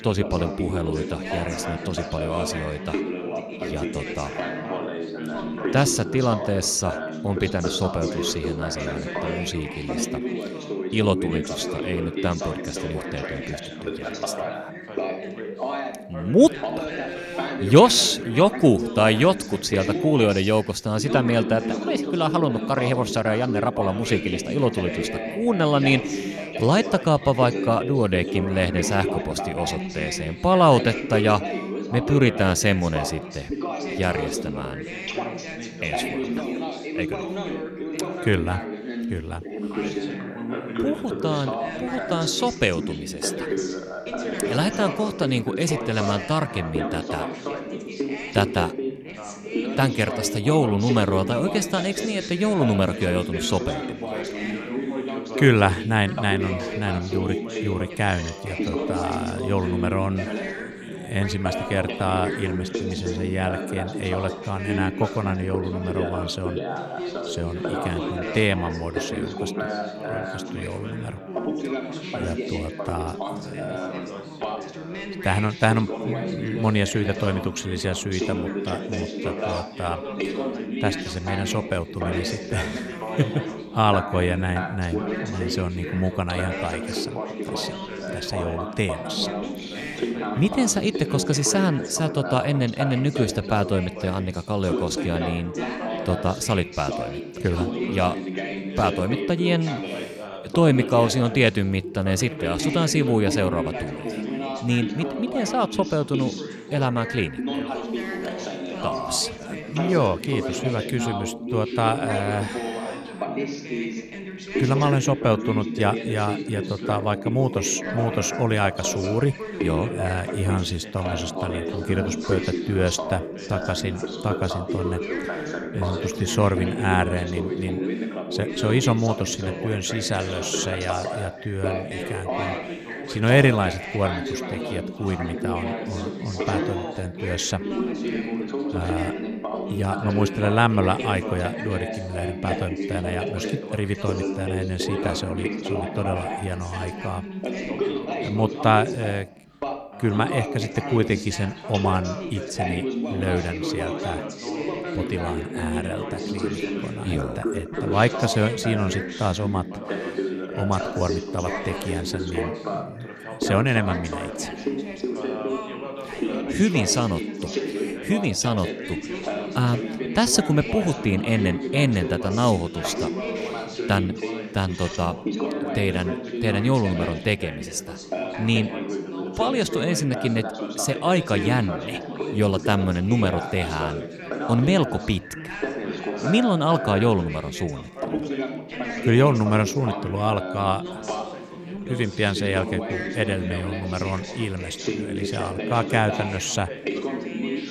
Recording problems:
background chatter; loud; throughout; 3 voices, 5 dB below the speech

